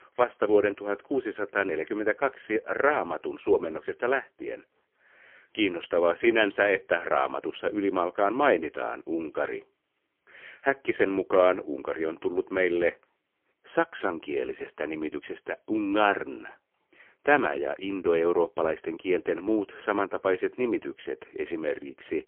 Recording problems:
phone-call audio; poor line; nothing above 3.5 kHz

